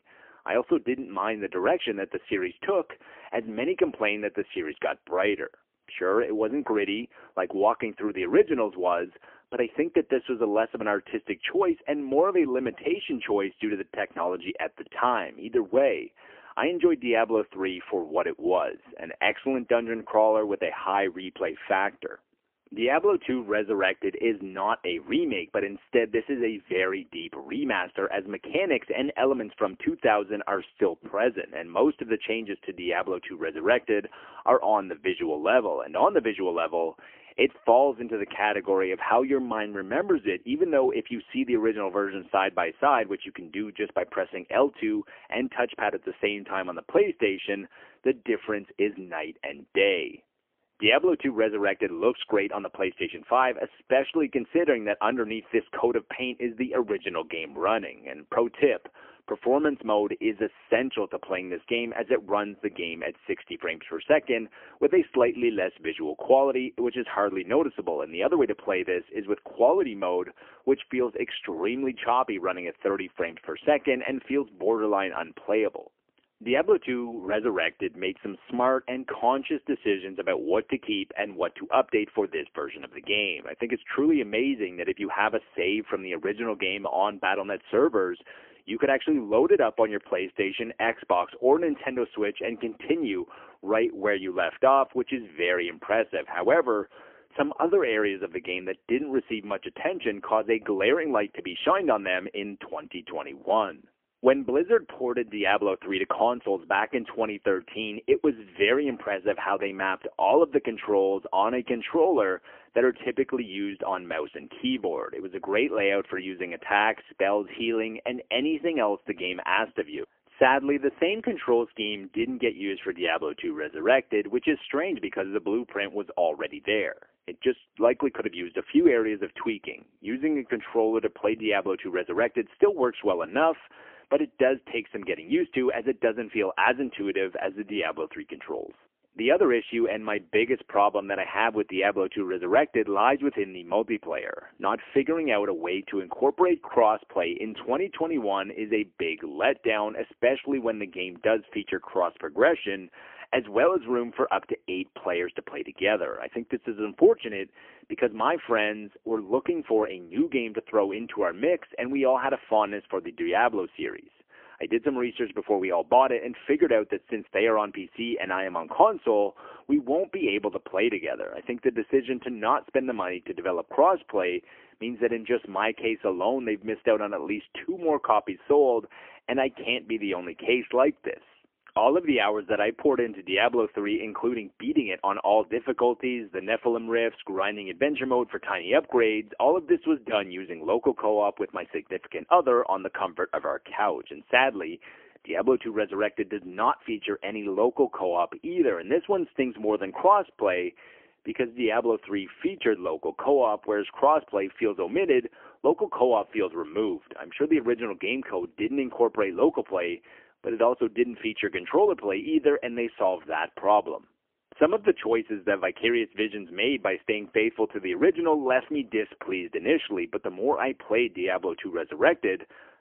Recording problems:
phone-call audio; poor line; nothing above 3 kHz

